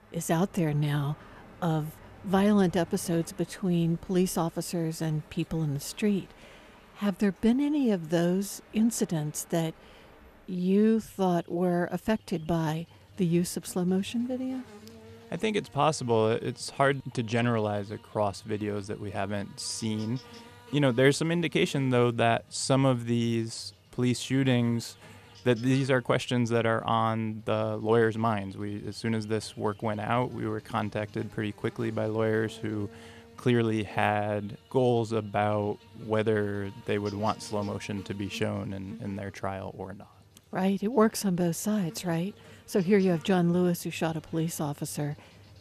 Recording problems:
animal sounds; faint; throughout; 25 dB below the speech

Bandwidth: 14 kHz